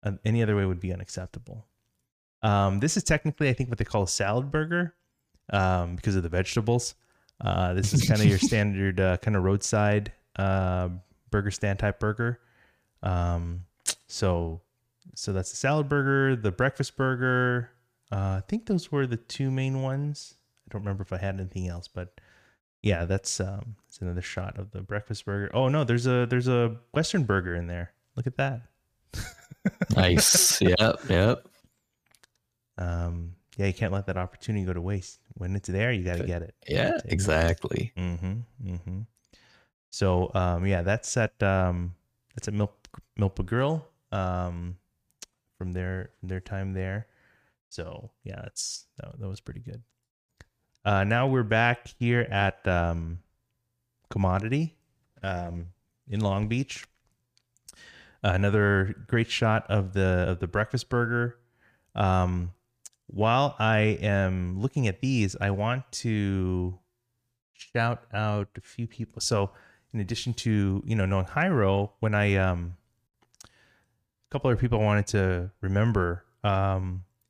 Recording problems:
none

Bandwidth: 15 kHz